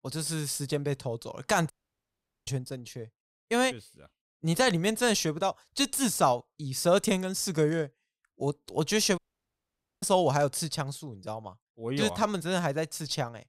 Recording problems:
audio cutting out; at 1.5 s for 1 s and at 9 s for 1 s

